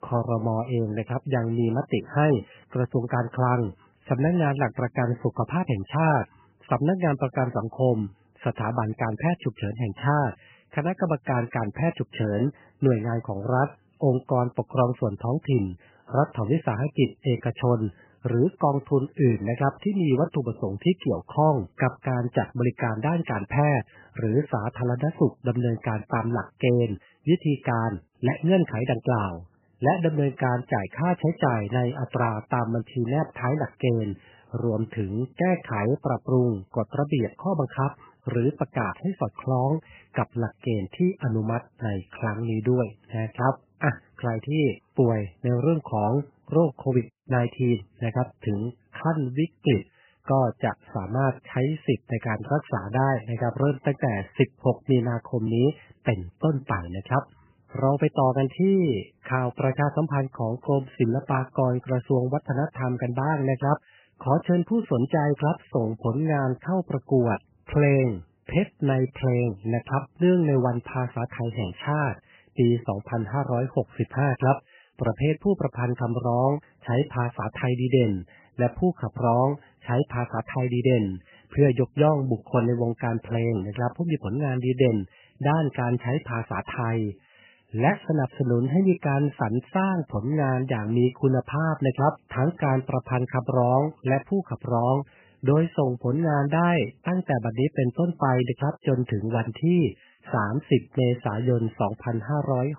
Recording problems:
garbled, watery; badly; nothing above 3 kHz

